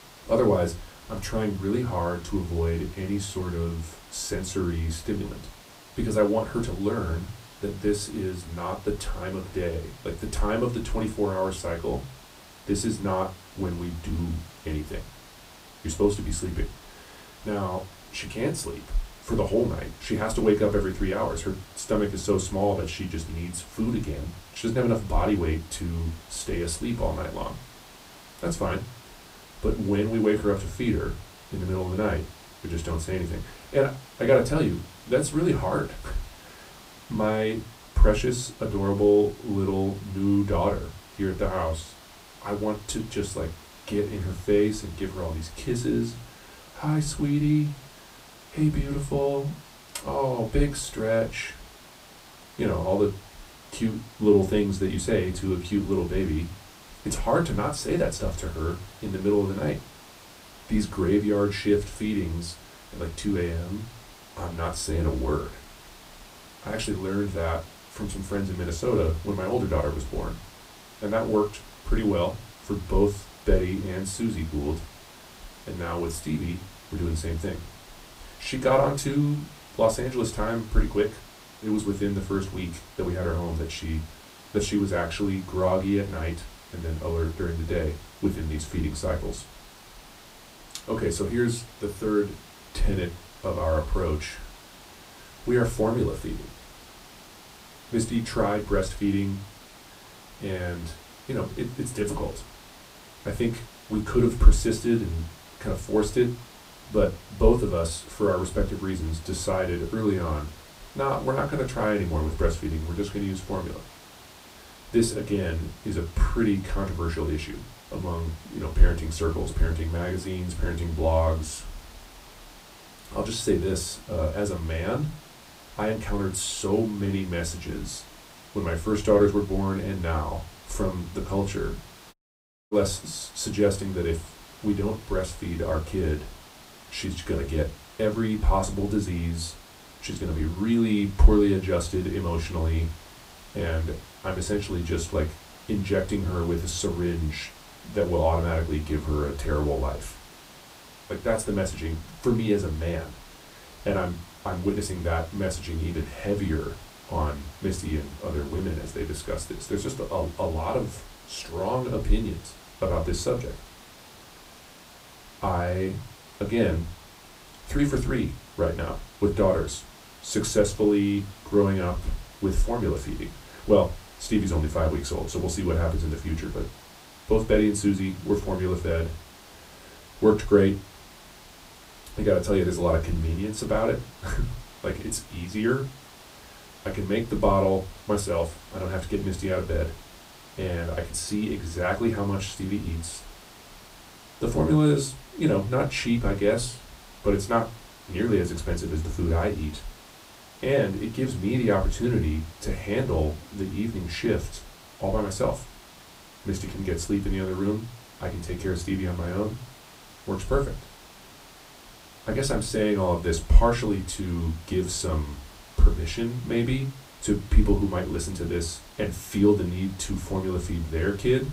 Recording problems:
off-mic speech; far
room echo; very slight; dies away in 0.2 s
hiss; noticeable; throughout; 20 dB below the speech
audio cutting out; at 2:12 for 0.5 s

